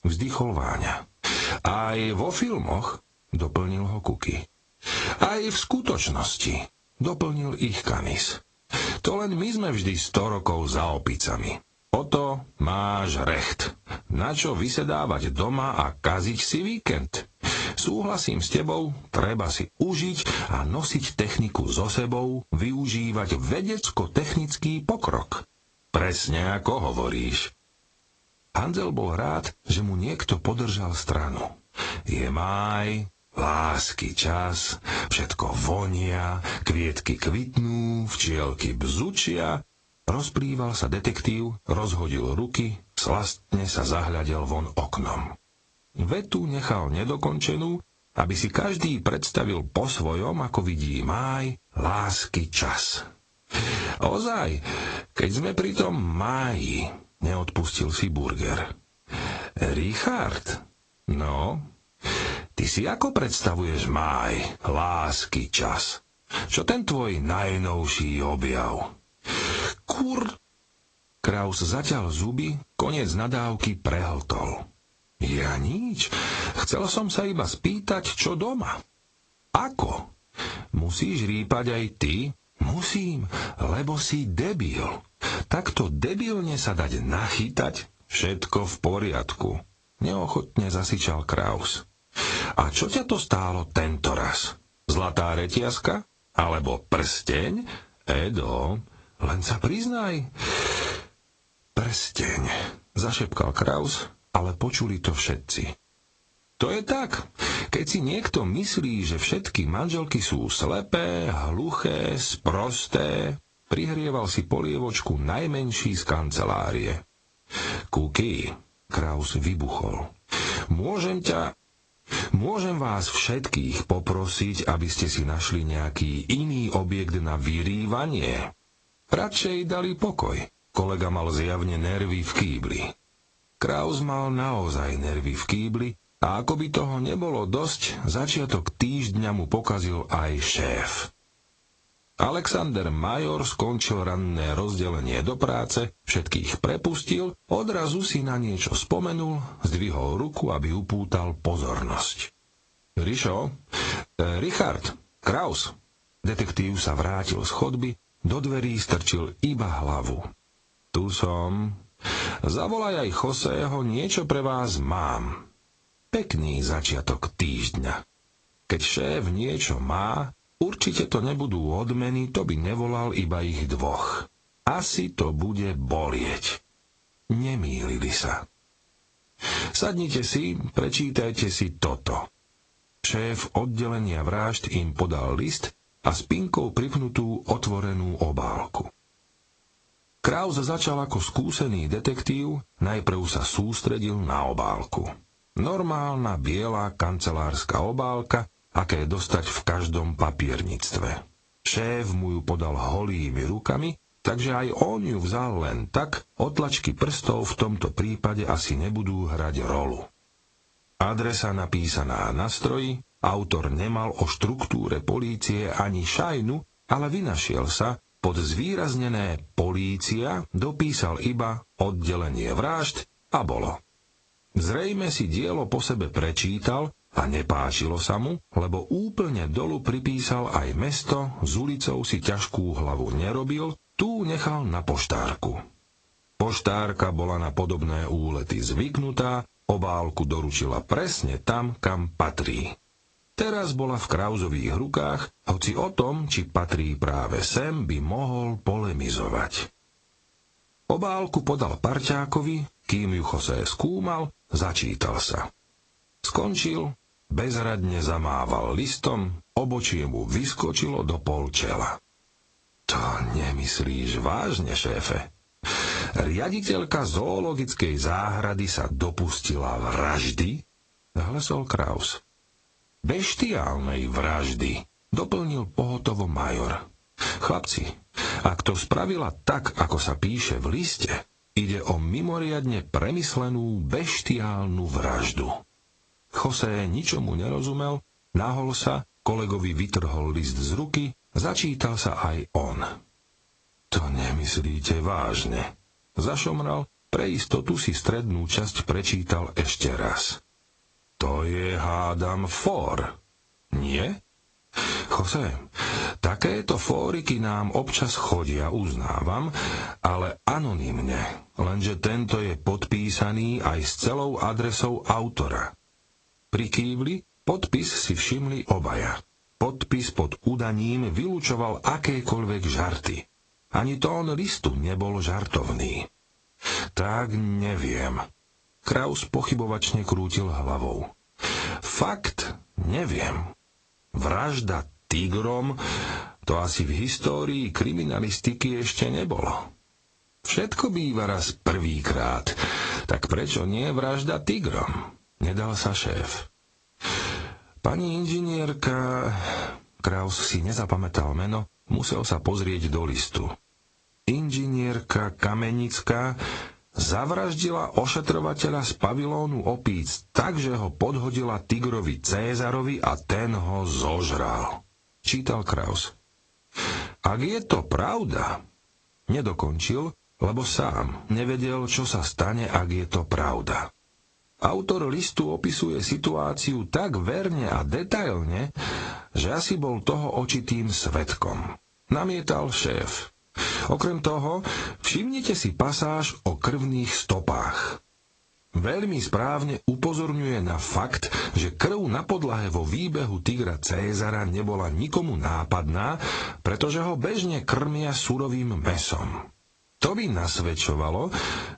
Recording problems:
squashed, flat; heavily
garbled, watery; slightly; nothing above 8 kHz

